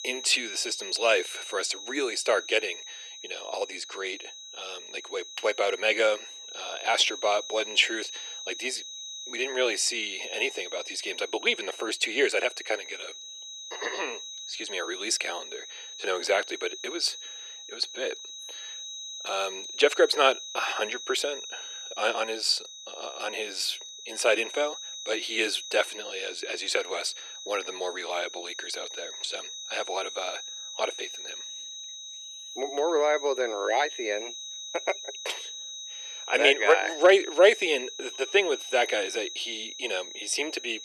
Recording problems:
thin; very; fading below 350 Hz
high-pitched whine; noticeable; throughout; 4 kHz, 10 dB below the speech

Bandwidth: 14 kHz